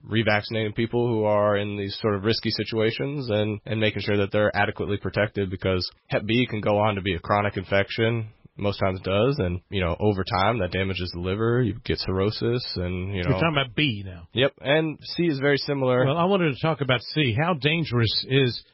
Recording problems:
garbled, watery; badly; nothing above 5.5 kHz

